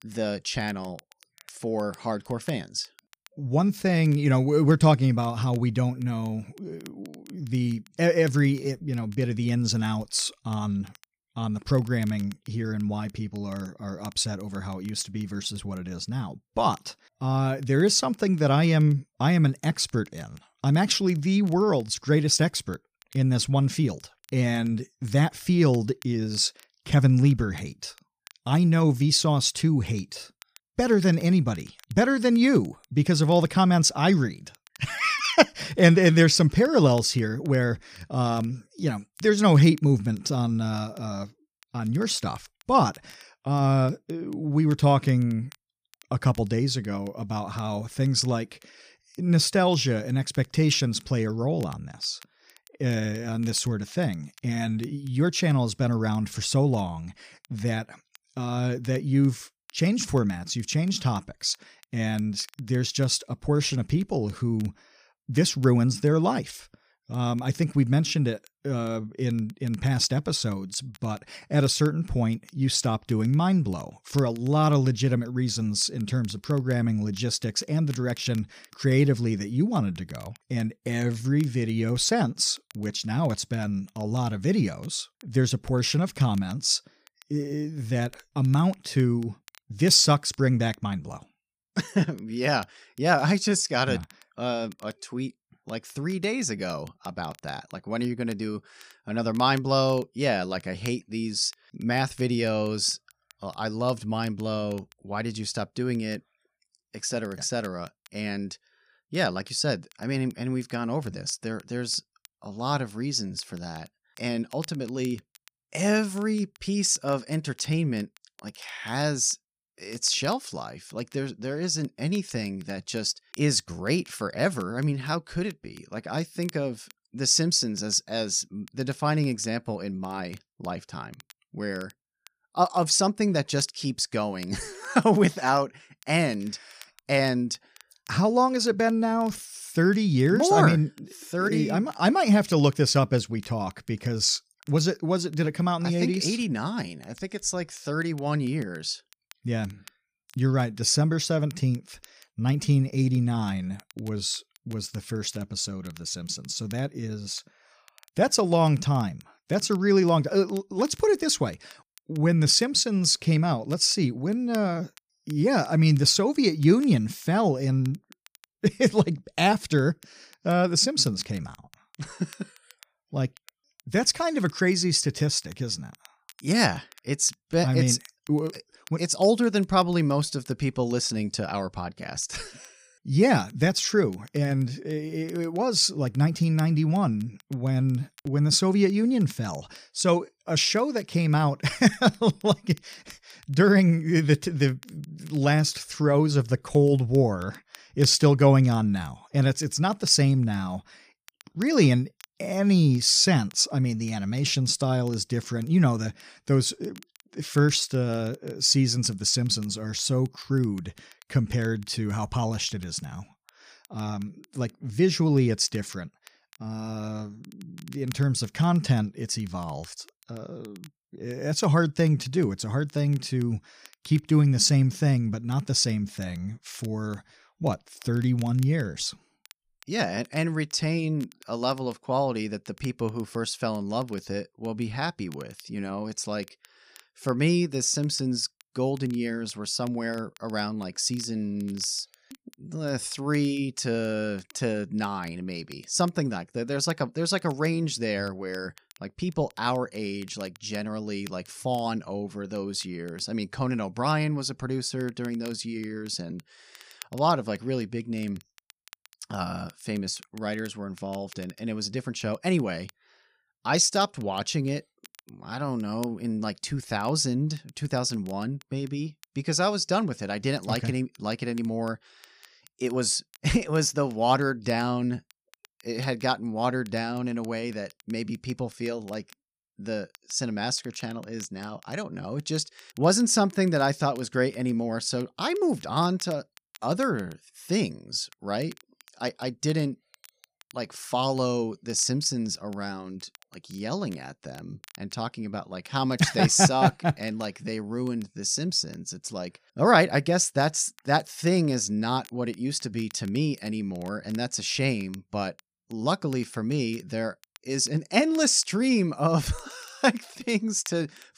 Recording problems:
crackle, like an old record; faint; 30 dB below the speech

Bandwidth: 15 kHz